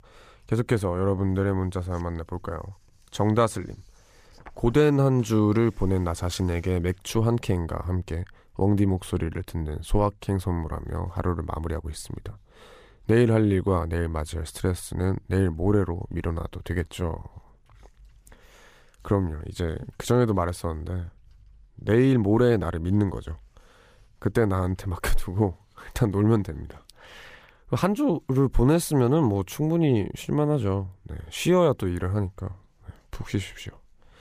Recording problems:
none

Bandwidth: 15 kHz